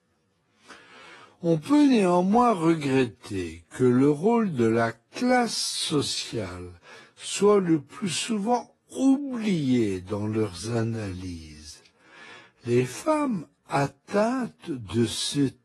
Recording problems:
wrong speed, natural pitch; too slow; 0.5 times normal speed
garbled, watery; slightly; nothing above 11 kHz

